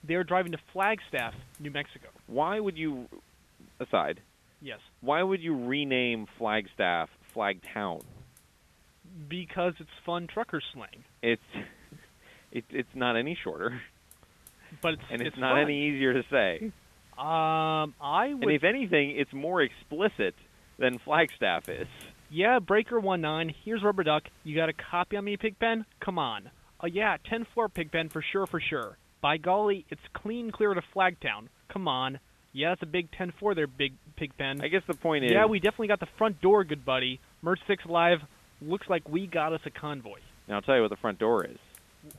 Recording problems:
high frequencies cut off; severe; nothing above 3.5 kHz
hiss; faint; throughout; 30 dB below the speech

